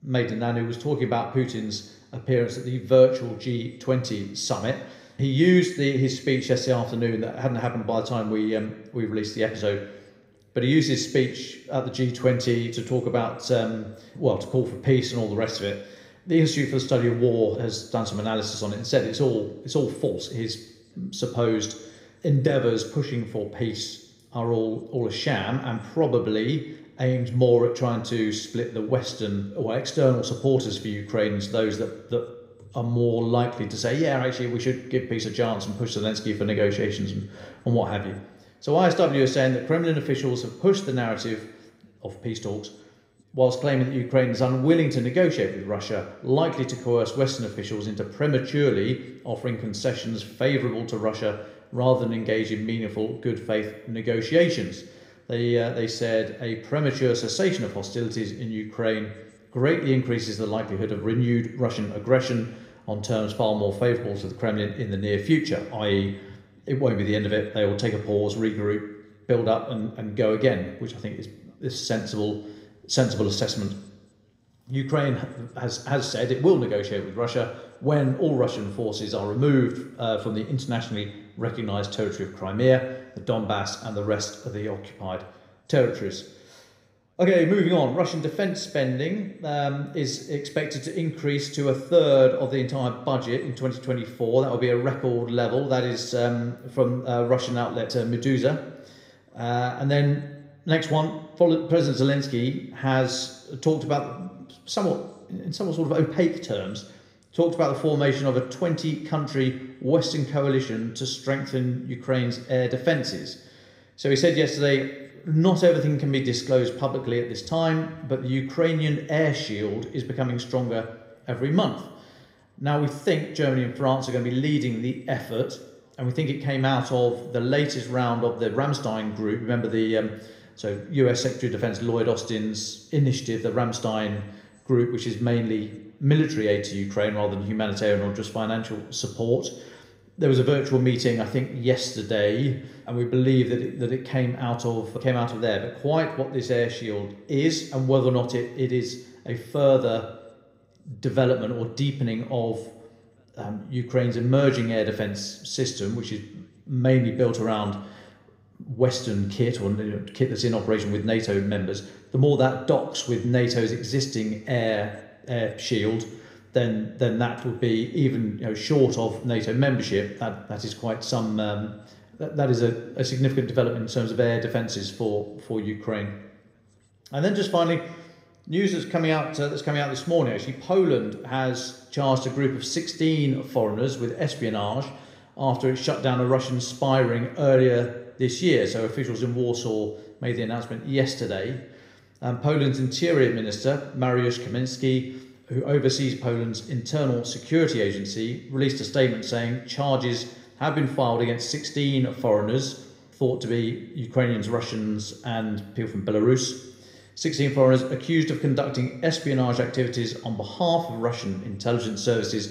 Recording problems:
room echo; slight; dies away in 0.8 s
off-mic speech; somewhat distant

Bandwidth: 15.5 kHz